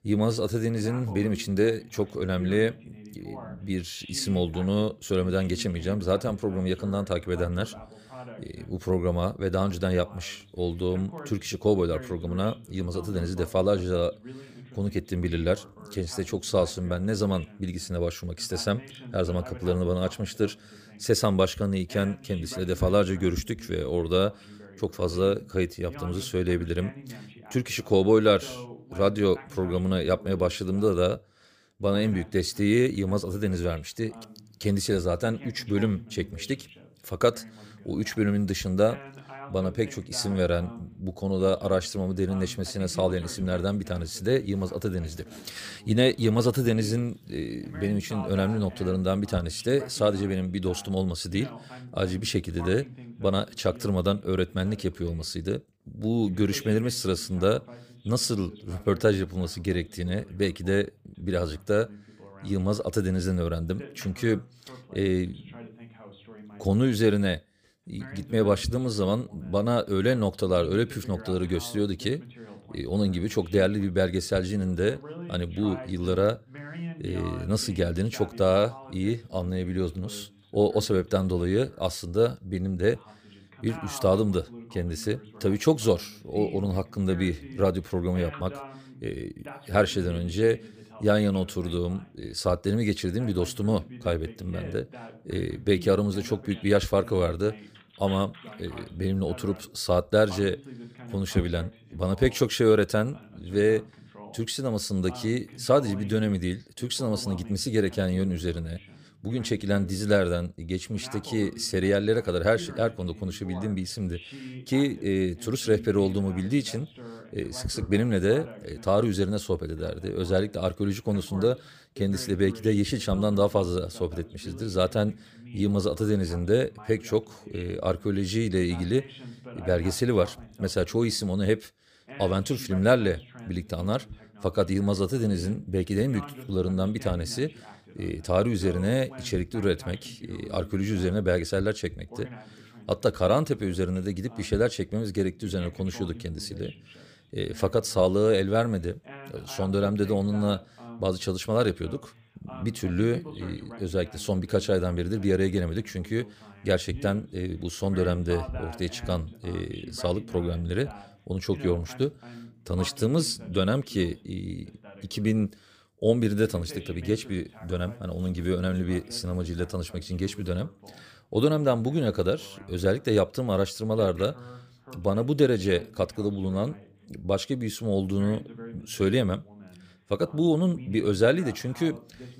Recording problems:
voice in the background; noticeable; throughout; 20 dB below the speech

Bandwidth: 15 kHz